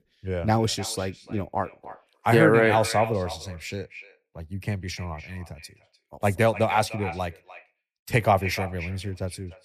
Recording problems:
echo of what is said; noticeable; throughout; 300 ms later, 15 dB below the speech

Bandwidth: 14.5 kHz